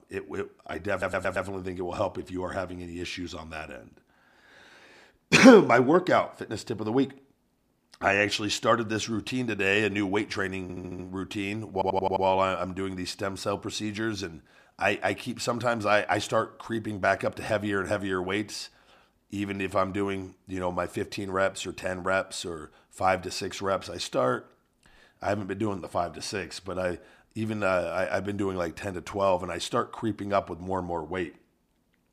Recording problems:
audio stuttering; at 1 s, at 11 s and at 12 s

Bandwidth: 15 kHz